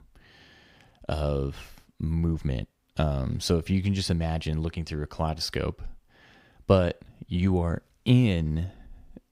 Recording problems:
none

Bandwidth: 15.5 kHz